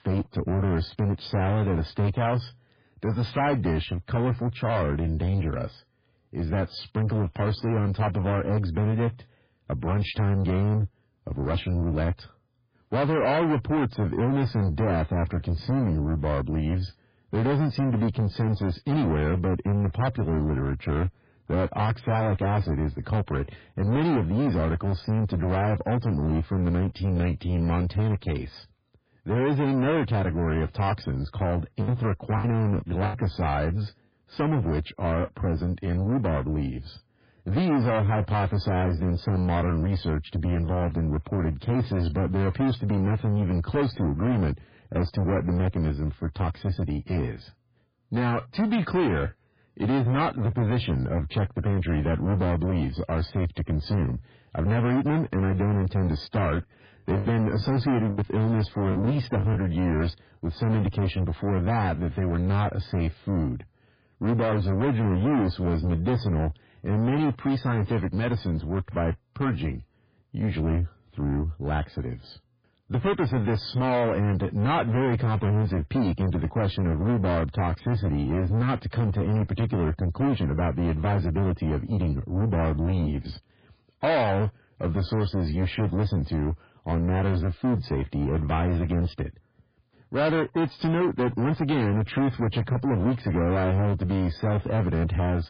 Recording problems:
distortion; heavy; 6 dB below the speech
garbled, watery; badly; nothing above 5 kHz
choppy; very; from 32 to 33 s and from 57 s to 1:00; 11% of the speech affected

